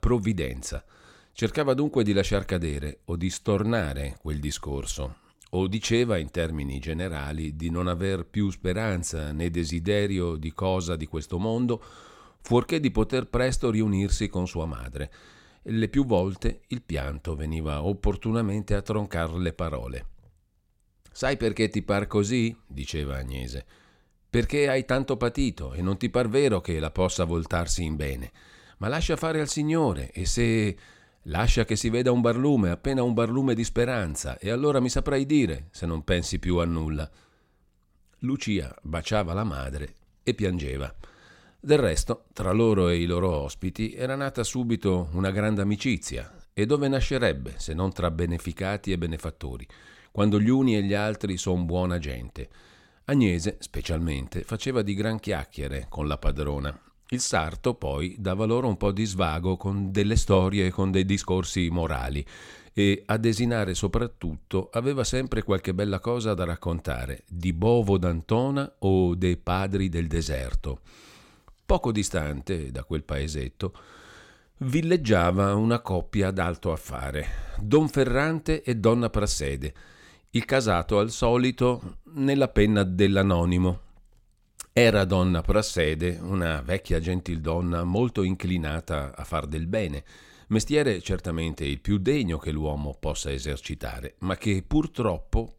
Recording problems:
none

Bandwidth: 16.5 kHz